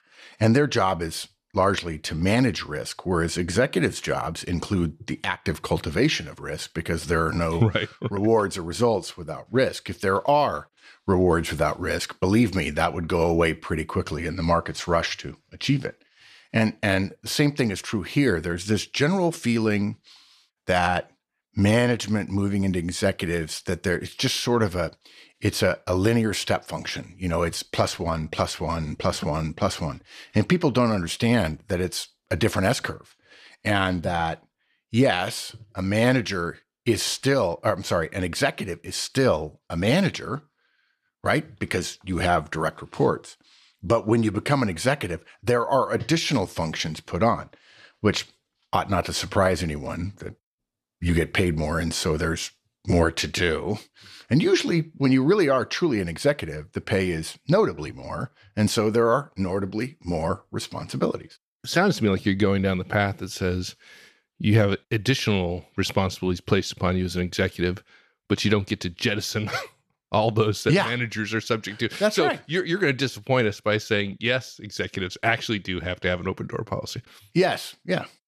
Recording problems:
none

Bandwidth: 14 kHz